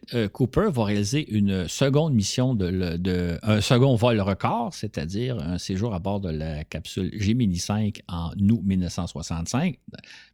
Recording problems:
none

